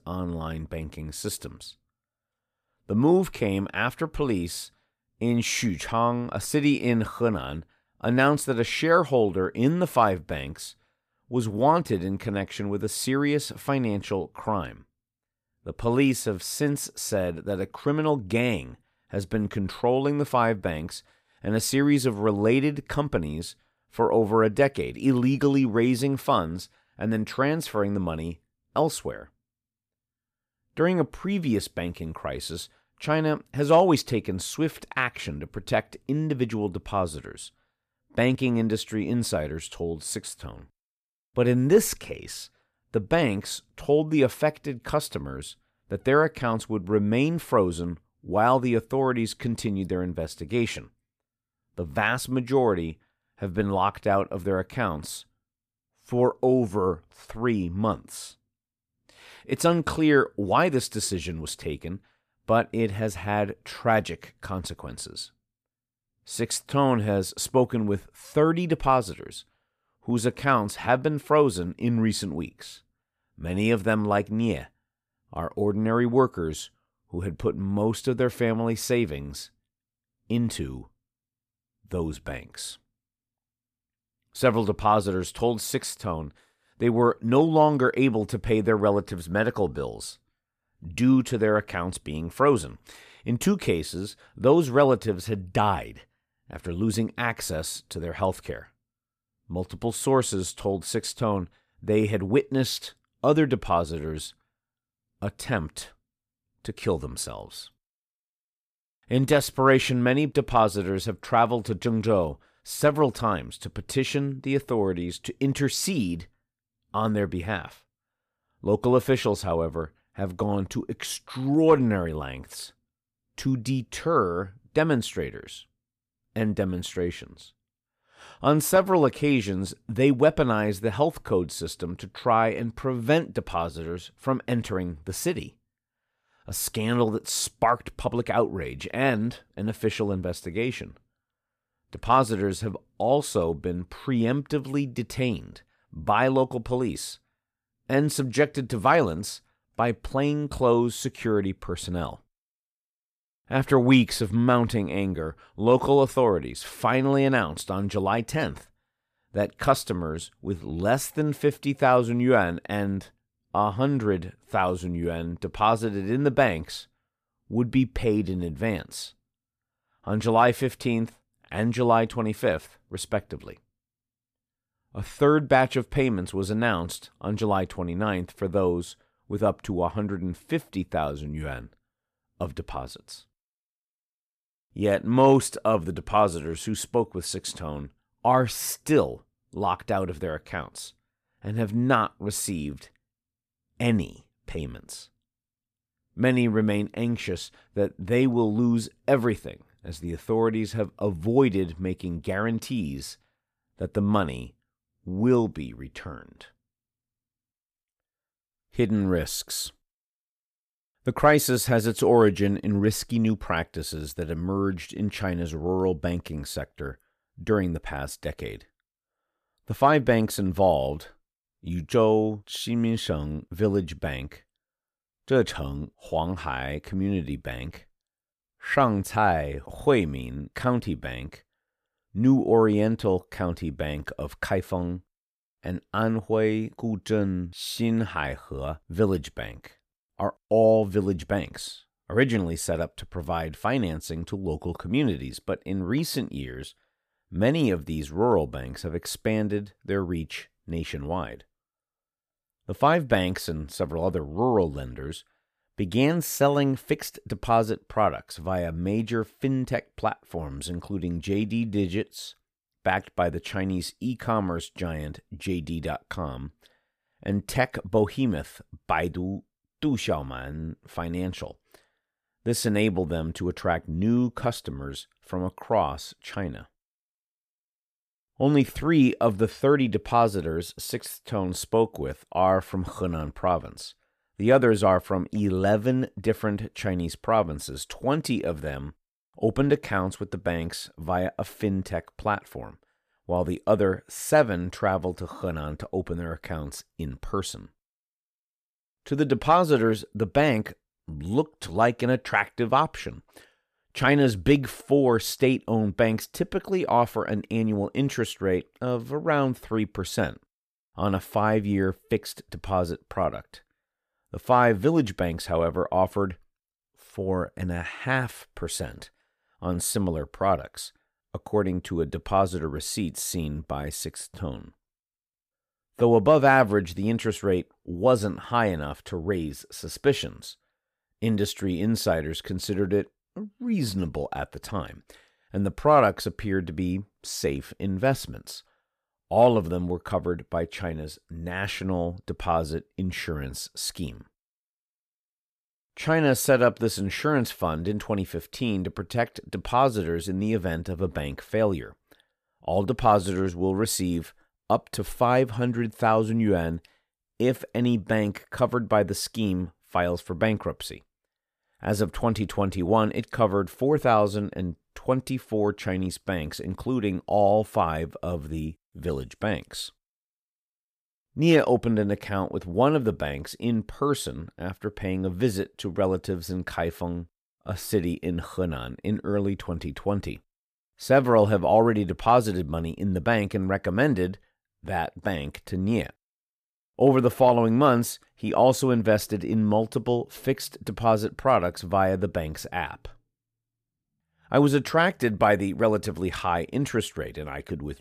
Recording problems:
none

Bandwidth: 14.5 kHz